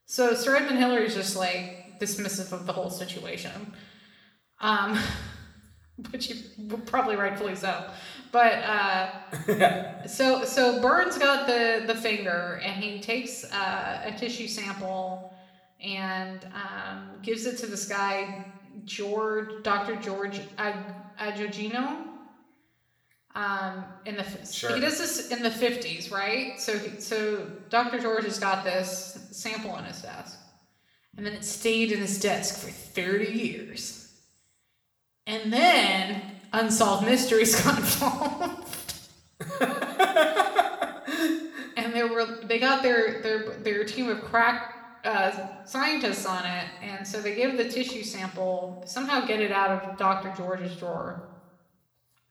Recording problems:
room echo; slight; dies away in 0.9 s
off-mic speech; somewhat distant

